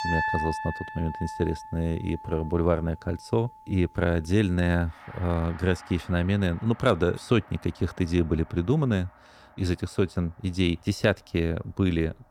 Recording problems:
background music; noticeable; throughout; 10 dB below the speech

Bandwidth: 18 kHz